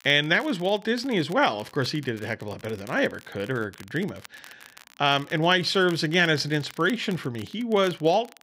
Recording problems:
crackle, like an old record; faint; 25 dB below the speech

